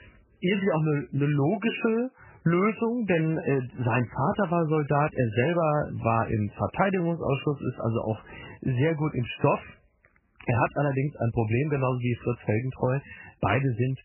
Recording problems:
garbled, watery; badly; nothing above 3 kHz

